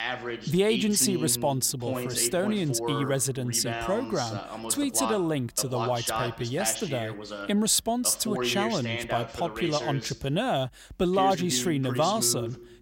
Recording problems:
voice in the background; loud; throughout; 7 dB below the speech

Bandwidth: 16 kHz